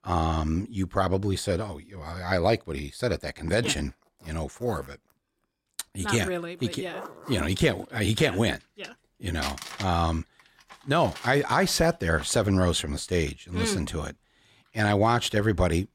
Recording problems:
household noises; noticeable; from 4 s on; 15 dB below the speech

